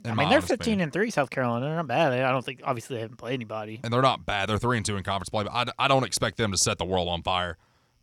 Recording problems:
none

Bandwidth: 18.5 kHz